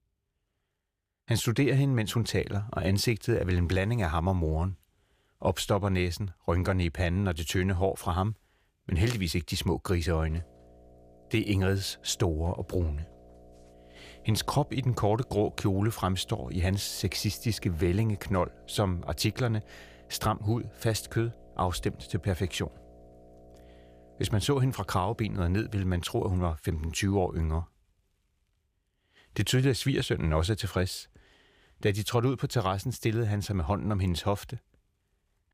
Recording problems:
electrical hum; faint; from 10 to 26 s; 60 Hz, 25 dB below the speech

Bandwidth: 15 kHz